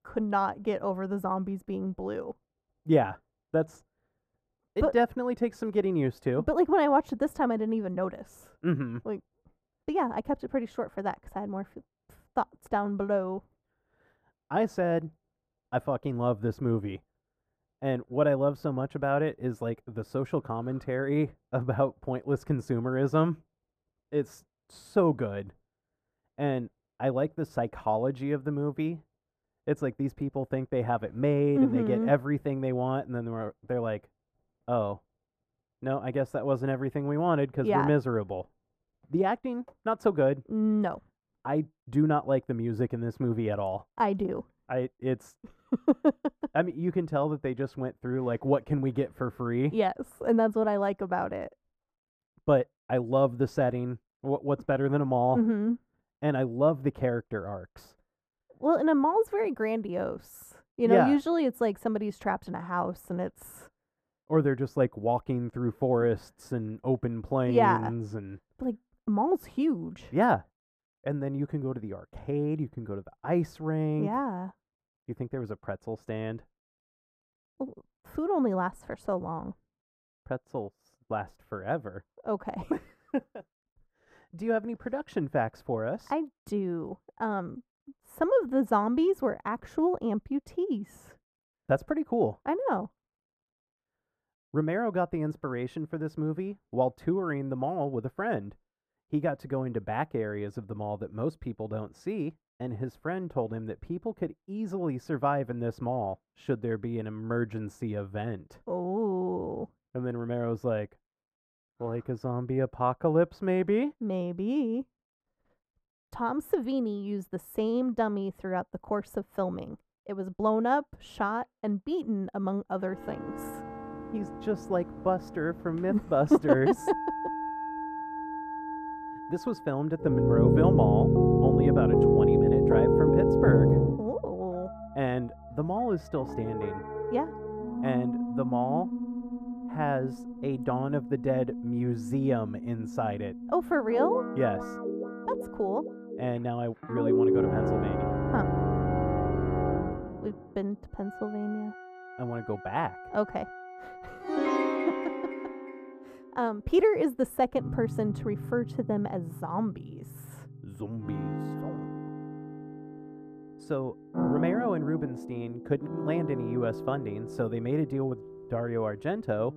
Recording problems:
muffled; very; fading above 2 kHz
background music; very loud; from 2:03 on; 1 dB above the speech

